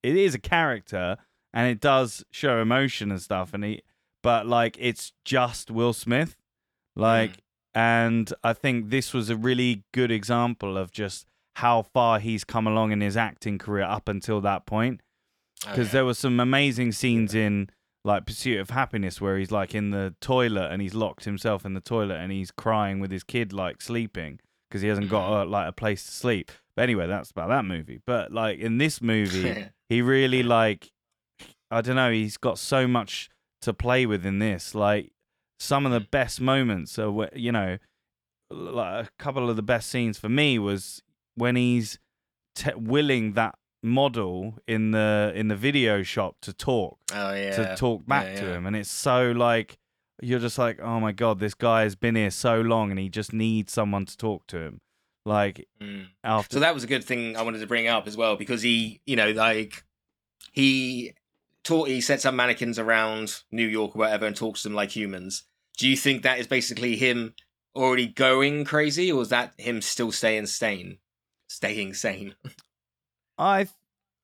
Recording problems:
none

